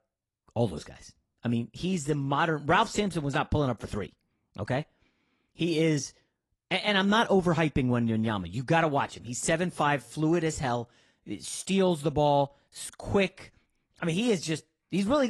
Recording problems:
garbled, watery; slightly
abrupt cut into speech; at the end

